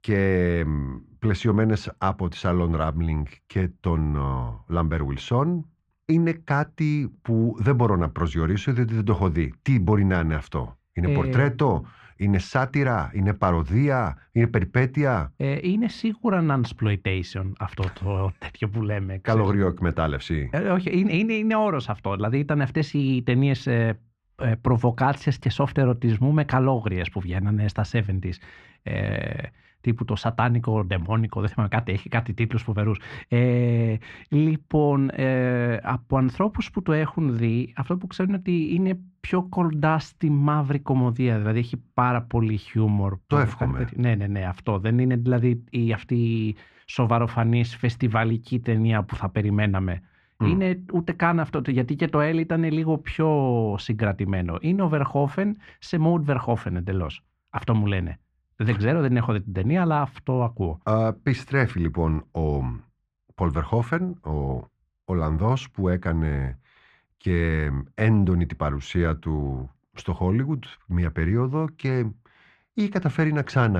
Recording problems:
muffled; slightly; fading above 2.5 kHz
abrupt cut into speech; at the end

